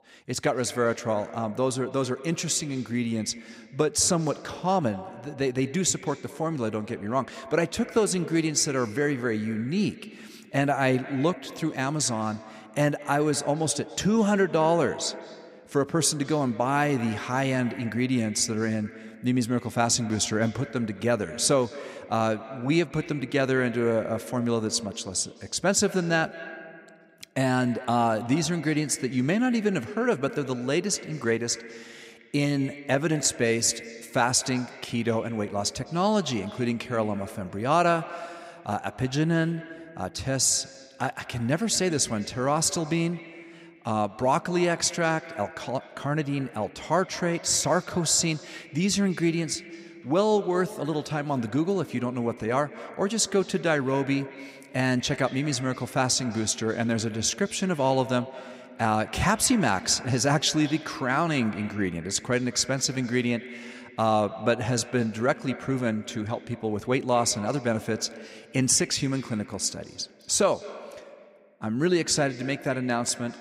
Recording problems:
echo of what is said; noticeable; throughout; 210 ms later, 15 dB below the speech

